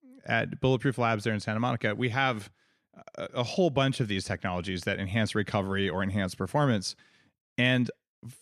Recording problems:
none

